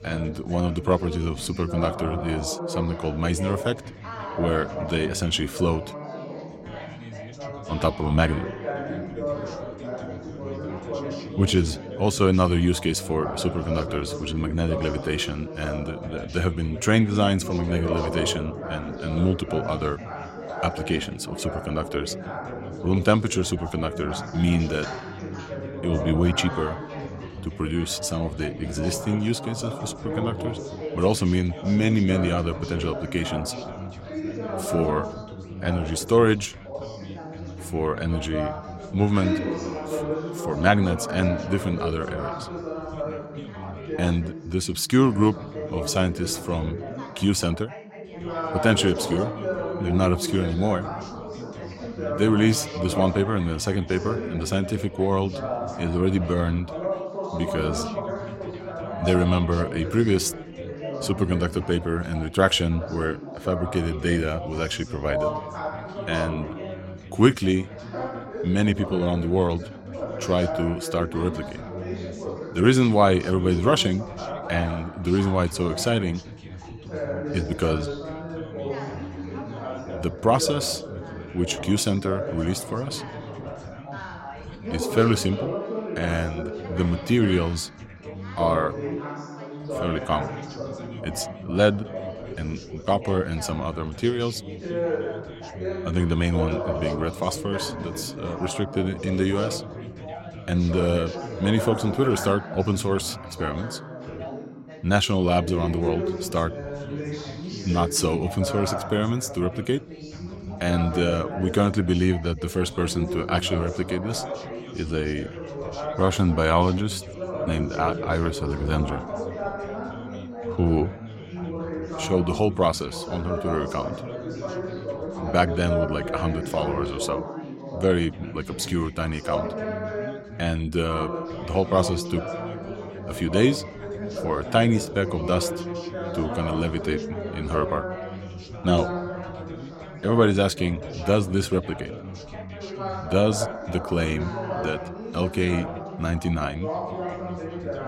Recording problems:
background chatter; loud; throughout; 4 voices, 8 dB below the speech

